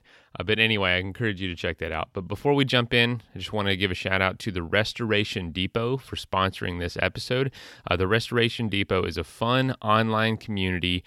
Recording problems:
none

